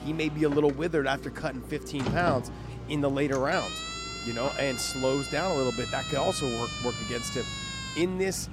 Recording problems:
traffic noise; noticeable; throughout; 10 dB below the speech
electrical hum; faint; throughout; 60 Hz, 25 dB below the speech
siren; noticeable; from 3.5 to 8 s; peak 4 dB below the speech

